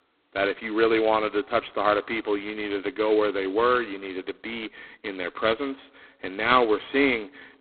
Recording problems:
phone-call audio; poor line; nothing above 4 kHz

